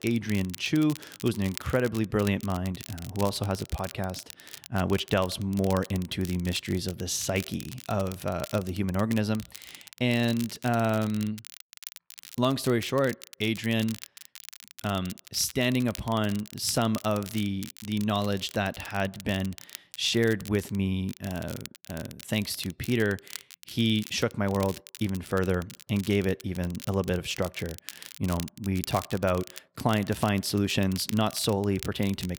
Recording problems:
crackle, like an old record; noticeable; 15 dB below the speech

